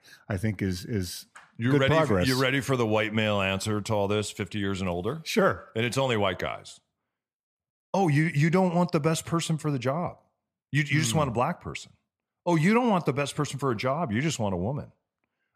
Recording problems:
none

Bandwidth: 14.5 kHz